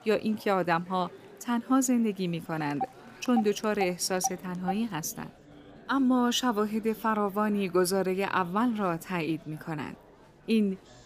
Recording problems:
murmuring crowd; faint; throughout; 25 dB below the speech
phone ringing; noticeable; from 3 to 4.5 s; peak 9 dB below the speech

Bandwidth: 15 kHz